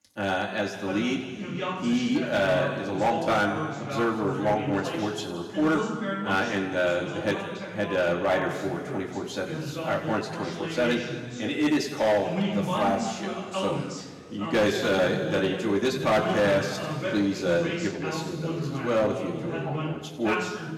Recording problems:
off-mic speech; far
room echo; noticeable; dies away in 1.9 s
distortion; slight; 4% of the sound clipped
voice in the background; loud; throughout; 6 dB below the speech

